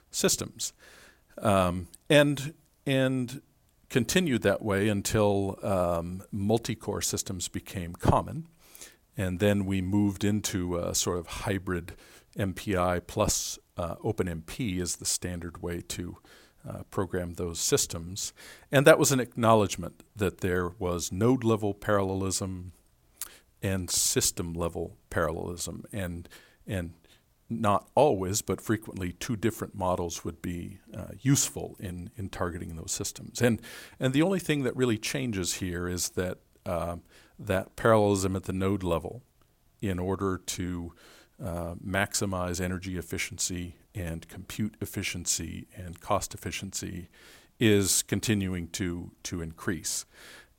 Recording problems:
none

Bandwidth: 16.5 kHz